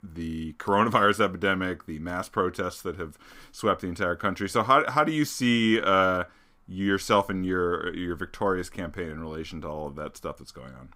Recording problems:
none

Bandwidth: 15.5 kHz